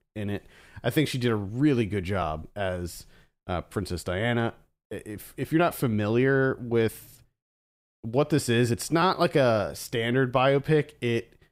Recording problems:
none

